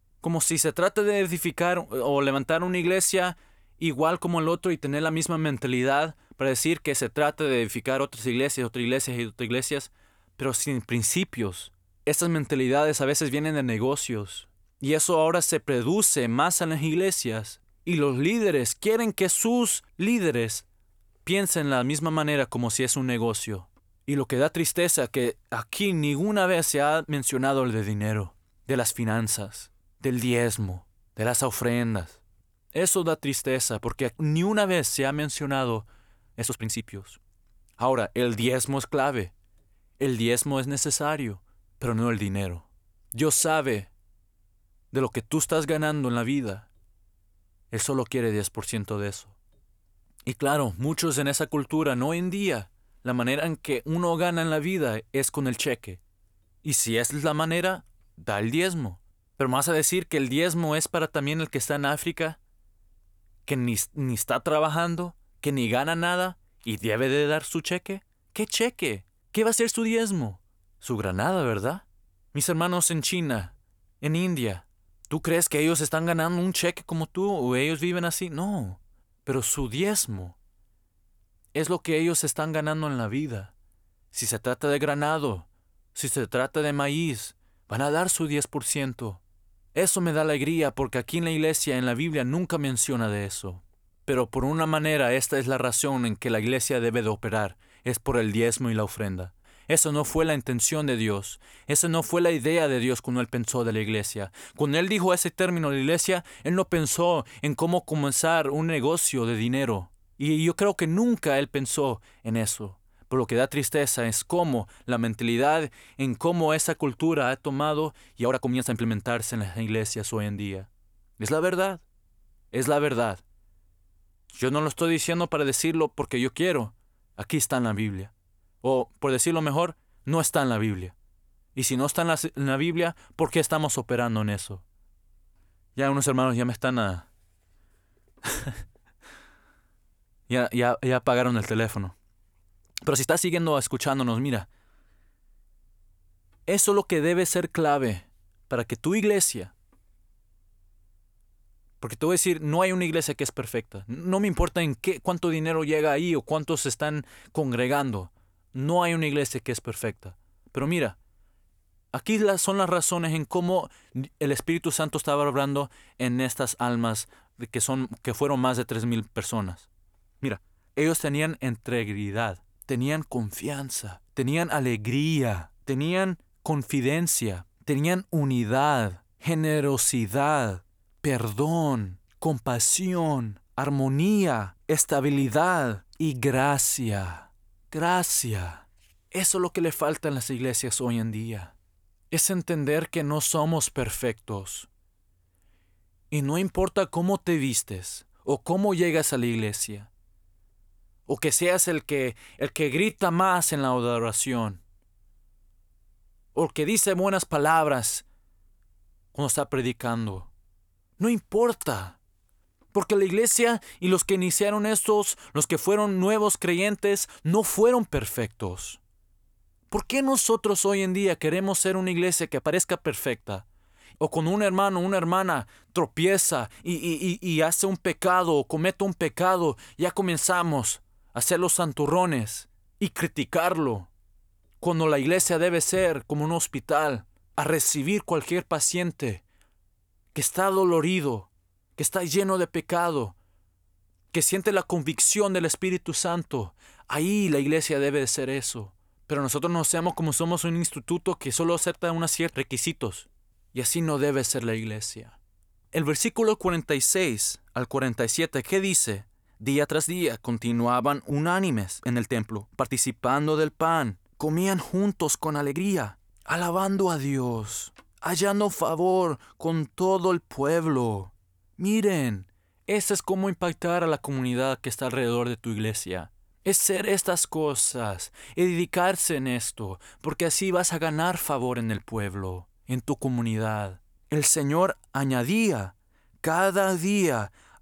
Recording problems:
uneven, jittery; strongly; from 36 s to 4:38

